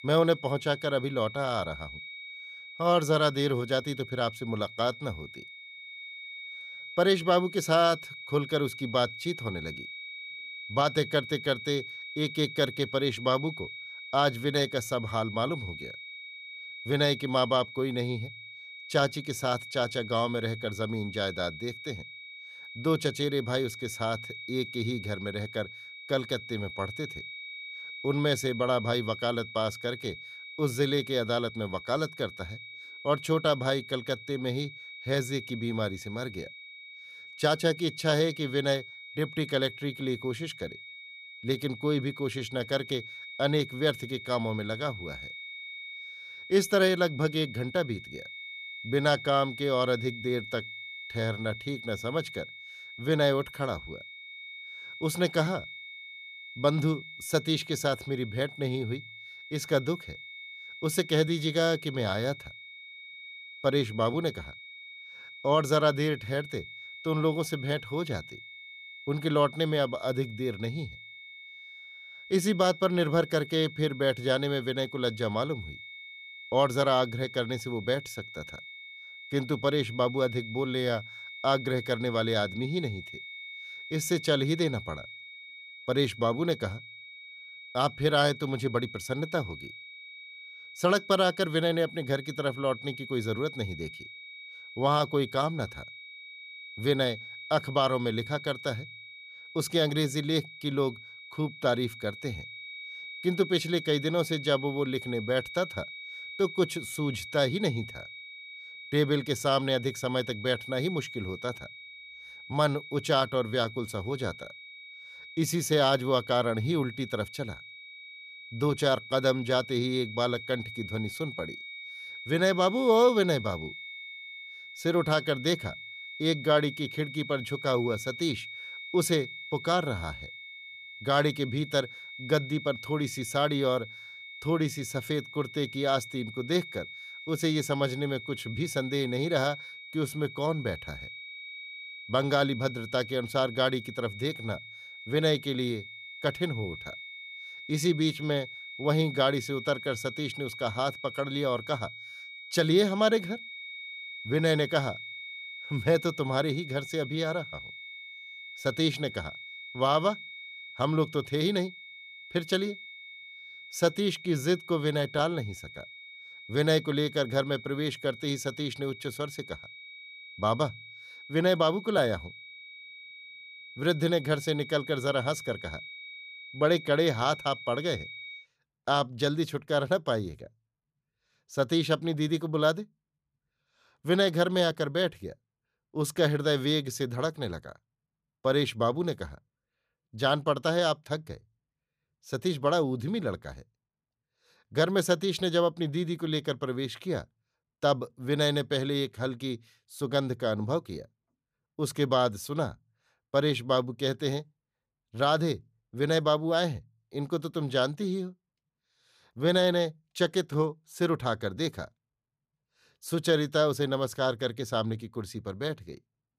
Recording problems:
high-pitched whine; noticeable; until 2:58; 2.5 kHz, 10 dB below the speech

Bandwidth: 14.5 kHz